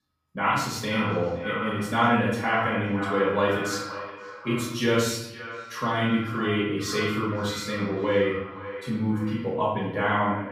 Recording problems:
echo of what is said; strong; throughout; 520 ms later, 10 dB below the speech
off-mic speech; far
room echo; noticeable; dies away in 0.8 s

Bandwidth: 15.5 kHz